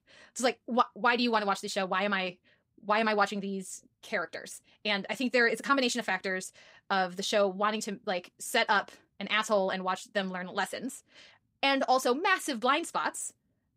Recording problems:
wrong speed, natural pitch; too fast; 1.5 times normal speed

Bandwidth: 15.5 kHz